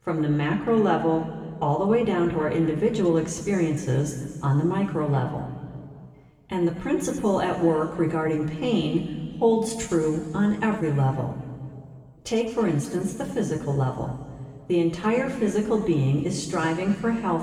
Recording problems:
room echo; noticeable; dies away in 2.1 s
off-mic speech; somewhat distant

